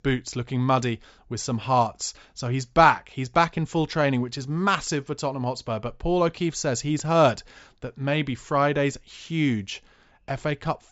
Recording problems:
high frequencies cut off; noticeable; nothing above 8 kHz

